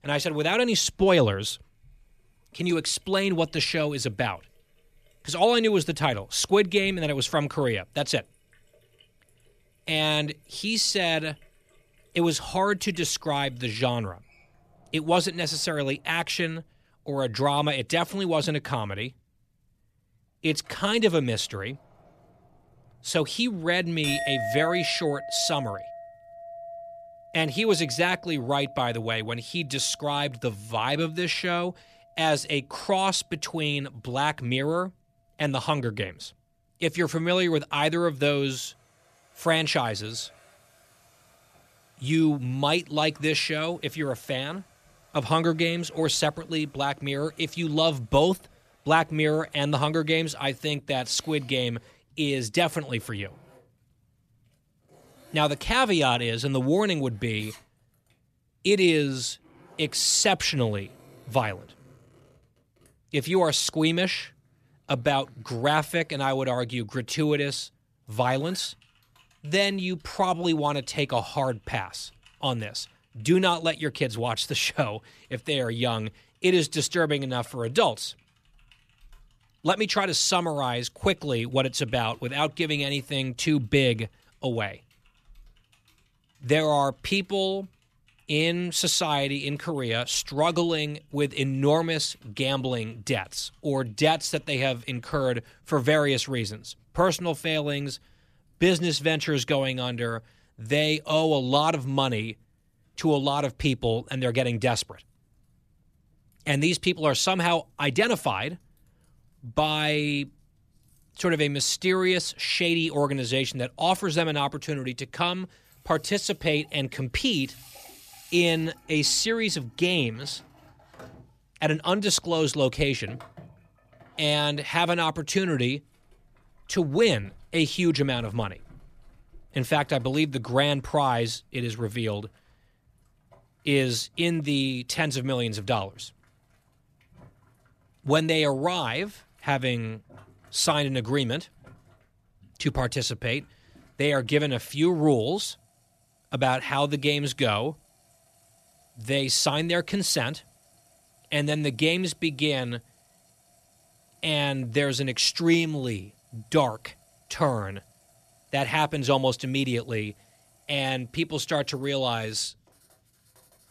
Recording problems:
household noises; faint; throughout; 20 dB below the speech

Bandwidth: 14.5 kHz